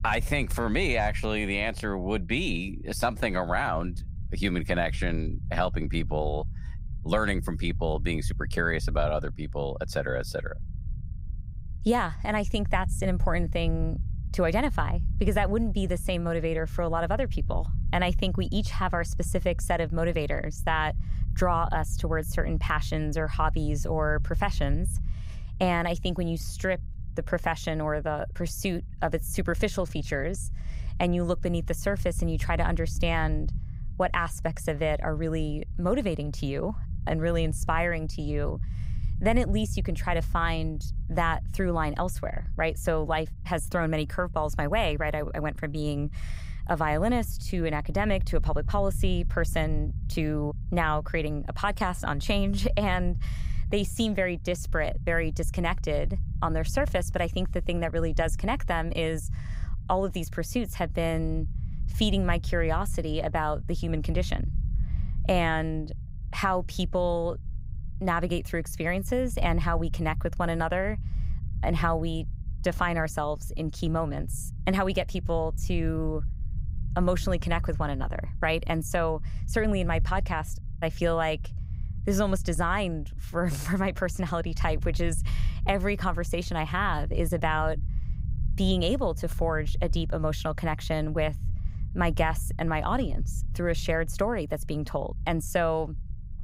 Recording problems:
low rumble; faint; throughout; 20 dB below the speech

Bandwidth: 15.5 kHz